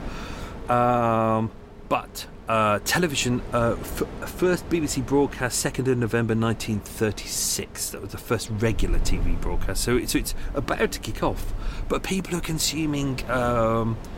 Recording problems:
wind in the background; noticeable; throughout; 15 dB below the speech

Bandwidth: 16 kHz